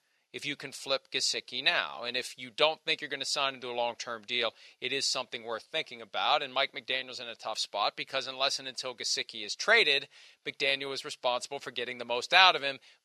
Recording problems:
thin; somewhat; fading below 400 Hz

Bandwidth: 14.5 kHz